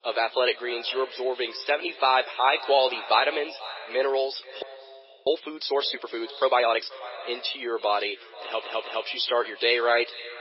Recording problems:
garbled, watery; badly; nothing above 5.5 kHz
thin; very; fading below 350 Hz
echo of what is said; noticeable; throughout; 480 ms later, 15 dB below the speech
audio freezing; at 4.5 s for 0.5 s
audio stuttering; at 8.5 s

